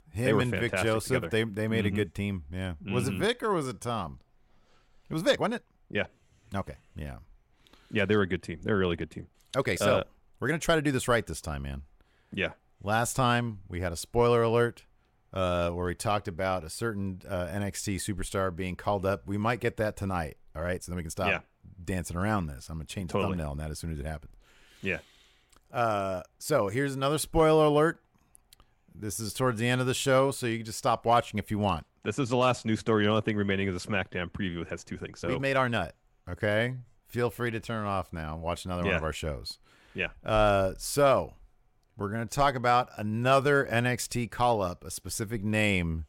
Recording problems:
uneven, jittery; strongly; from 3 to 42 s

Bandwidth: 16.5 kHz